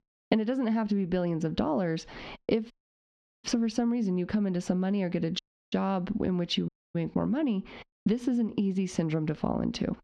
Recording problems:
squashed, flat; heavily
muffled; very slightly; fading above 4 kHz
audio cutting out; at 2.5 s for 0.5 s, at 5.5 s and at 6.5 s

